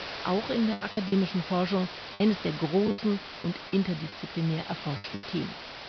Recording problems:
high frequencies cut off; noticeable; nothing above 5.5 kHz
hiss; loud; throughout; 9 dB below the speech
choppy; very; at 0.5 s and from 3 to 5 s; 14% of the speech affected

